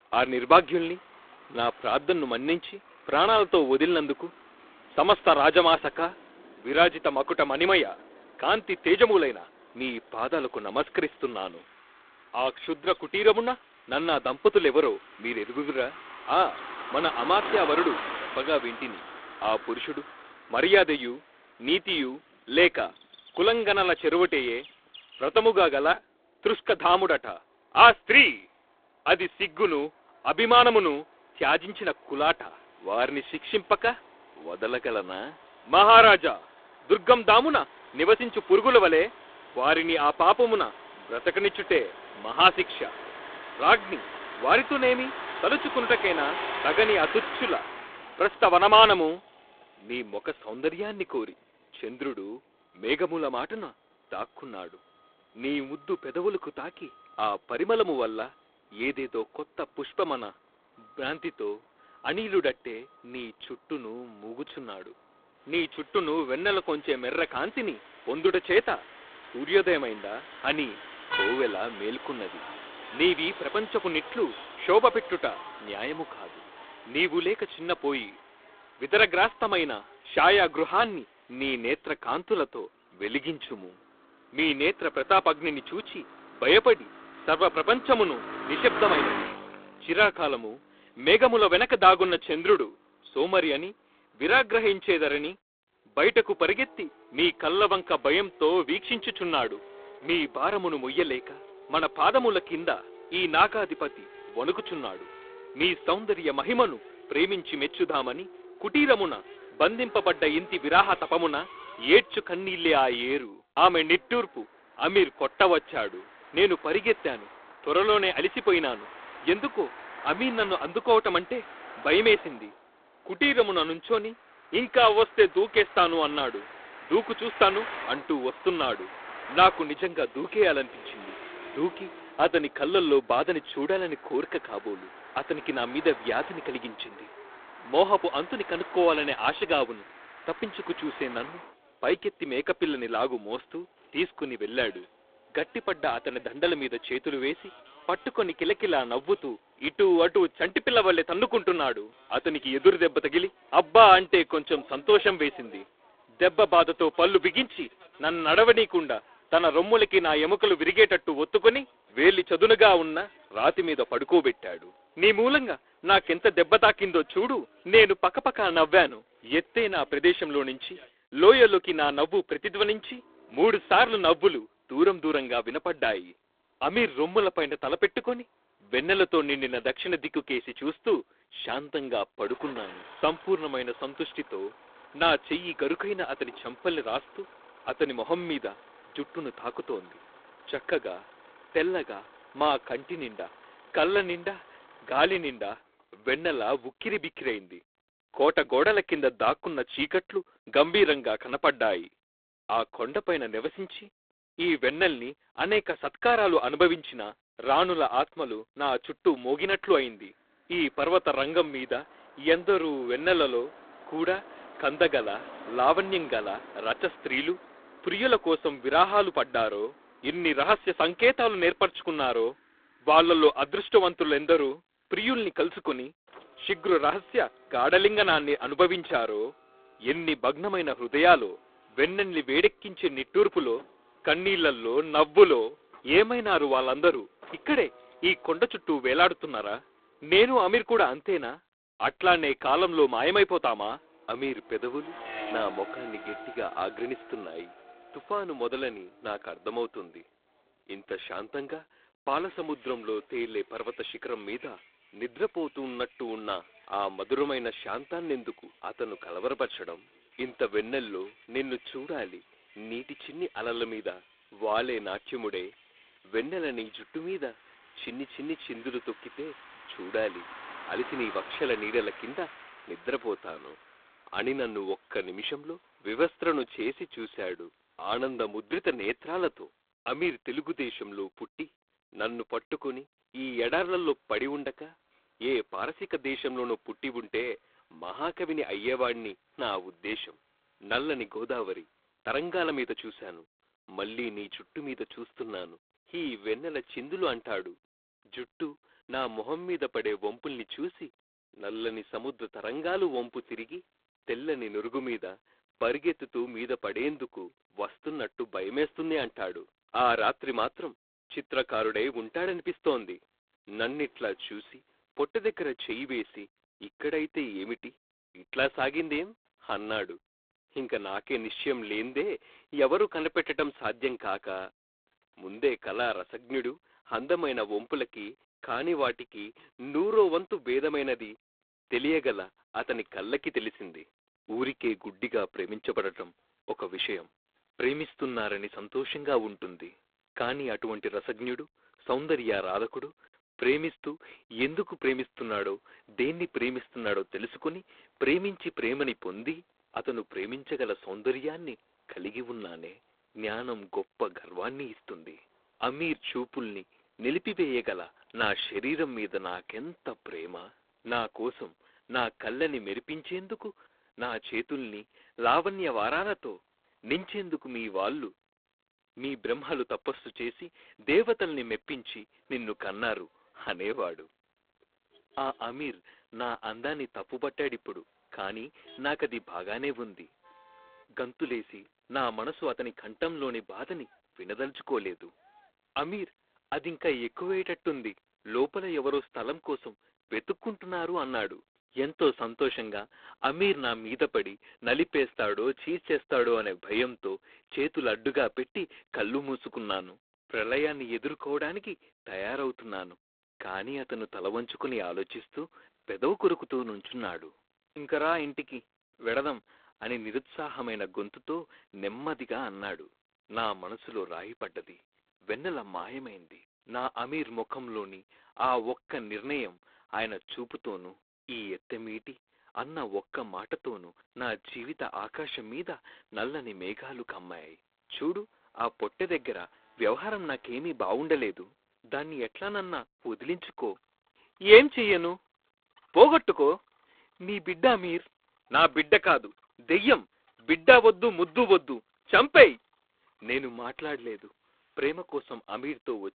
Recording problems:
phone-call audio; poor line
traffic noise; noticeable; throughout; 15 dB below the speech

